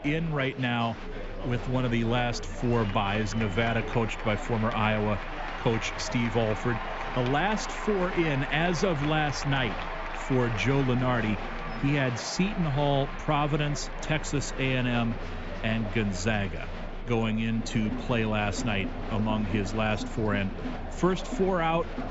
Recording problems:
high frequencies cut off; noticeable; nothing above 8 kHz
chatter from many people; loud; throughout; 8 dB below the speech

